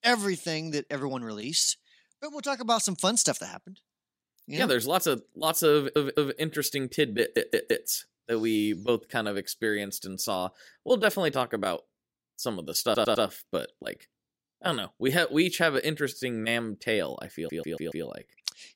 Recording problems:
audio stuttering; 4 times, first at 6 s

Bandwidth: 16 kHz